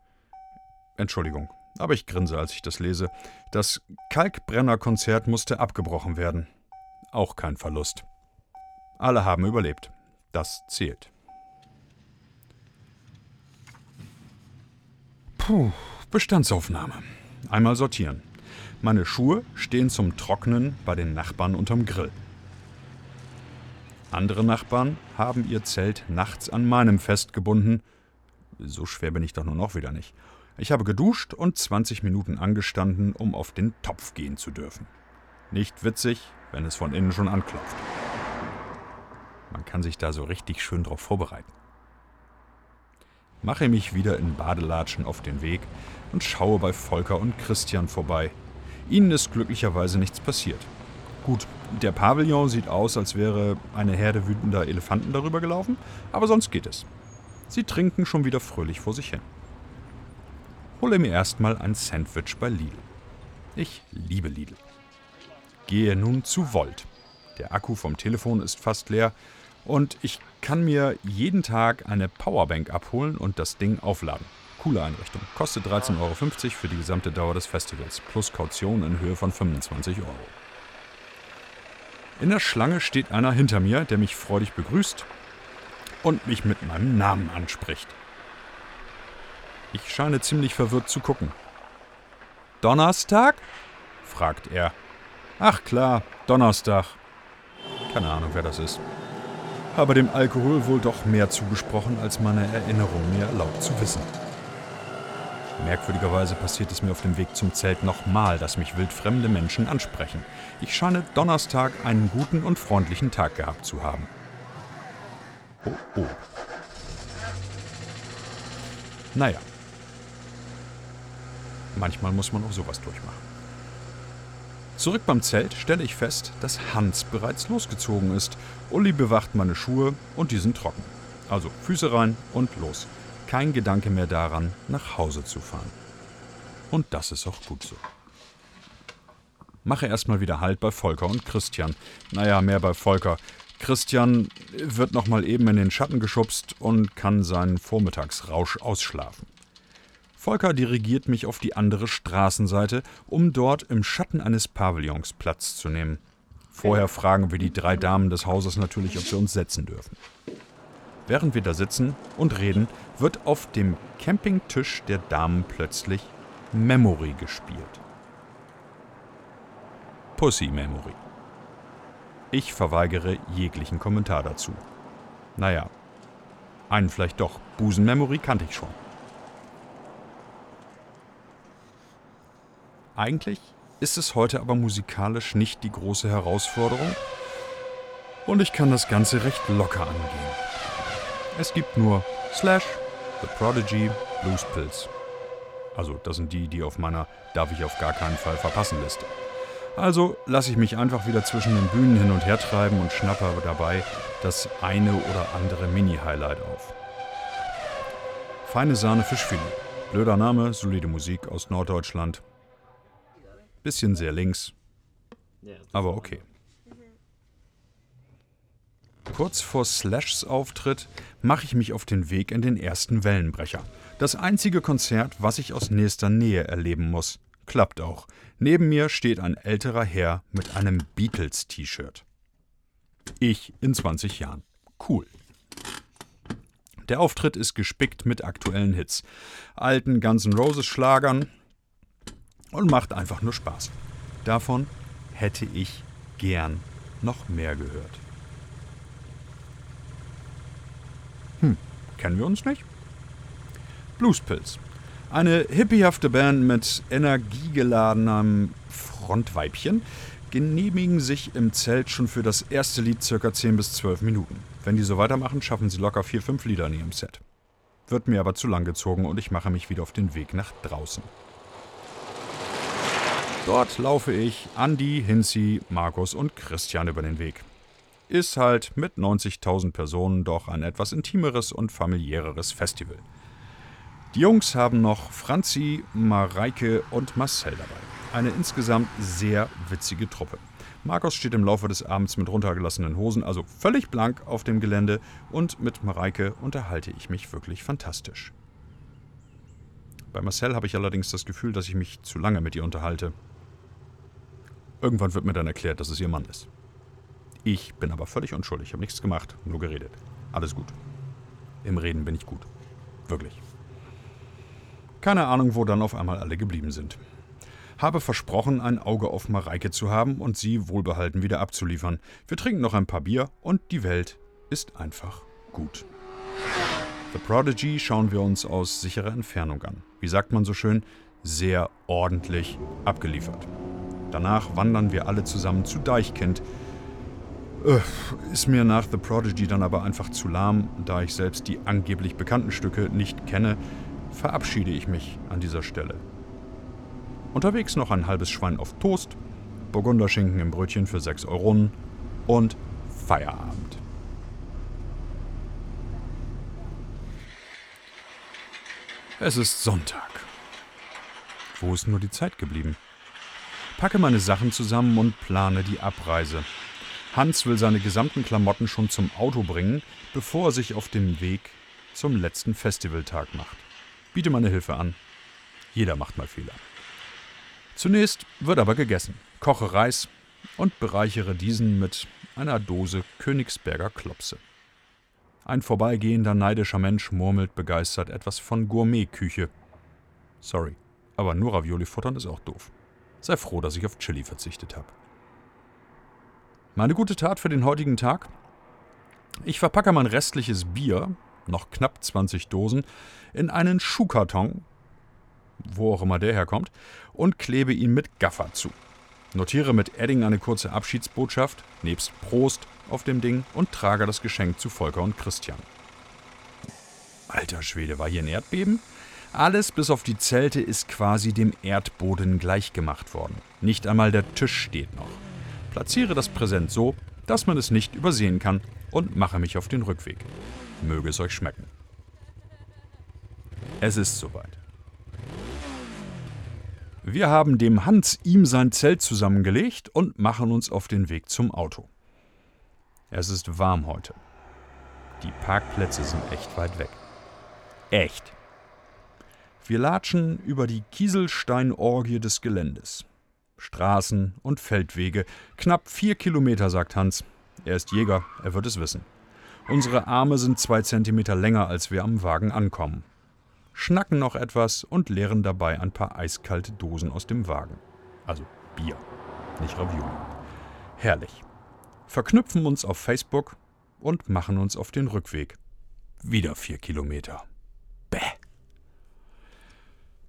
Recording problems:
traffic noise; noticeable; throughout; 15 dB below the speech

